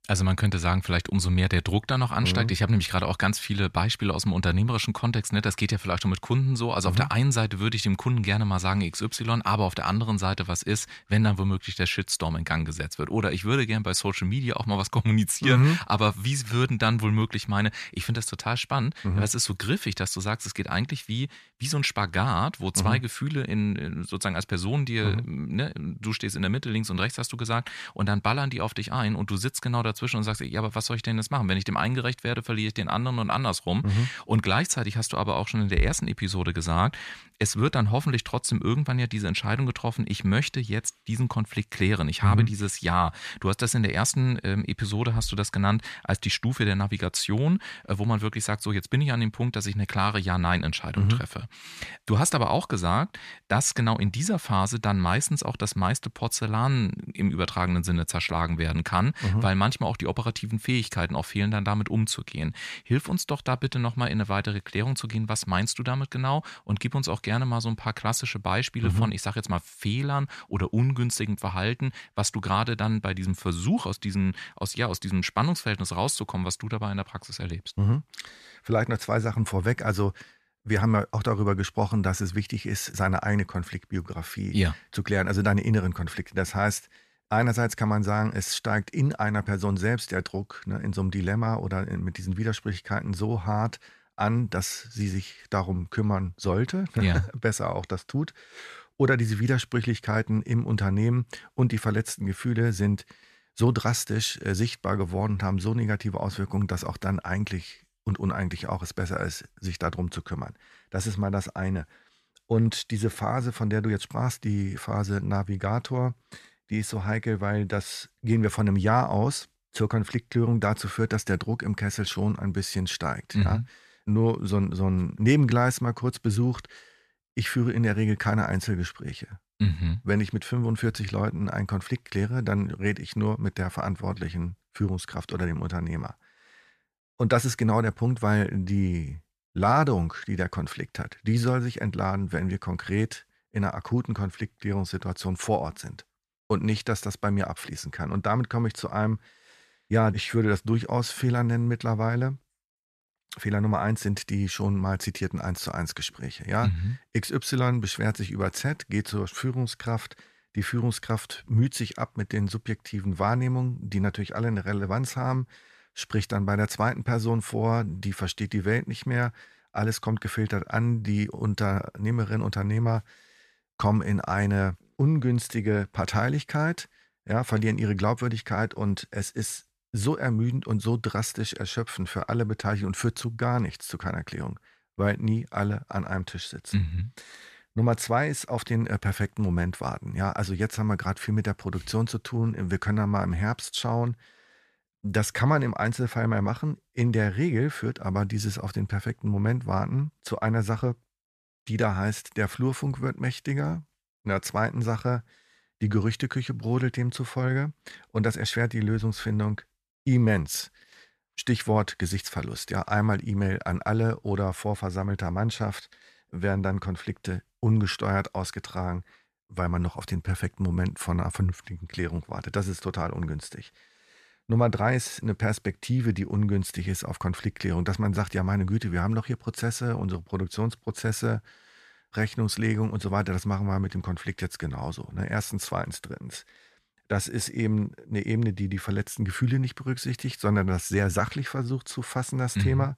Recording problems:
none

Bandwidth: 14.5 kHz